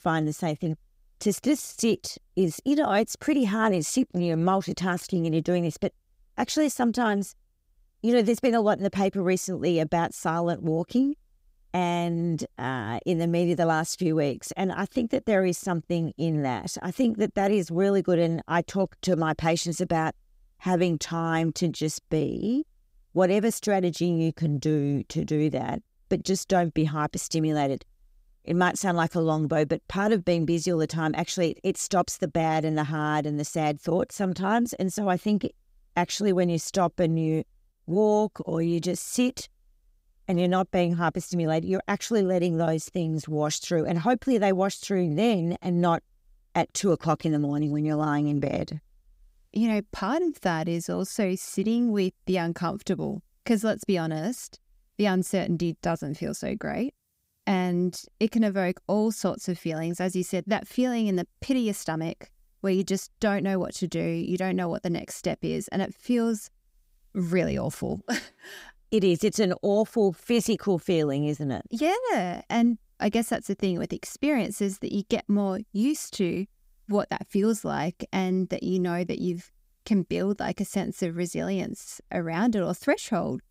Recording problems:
none

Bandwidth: 15.5 kHz